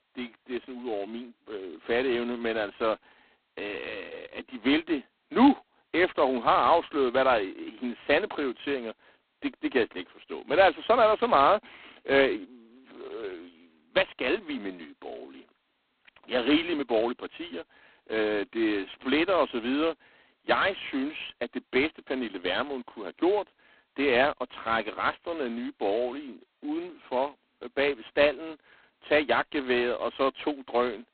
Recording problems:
phone-call audio; poor line; nothing above 4 kHz

